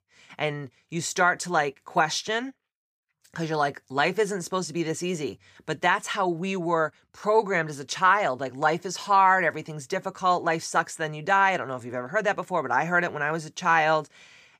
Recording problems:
none

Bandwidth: 15 kHz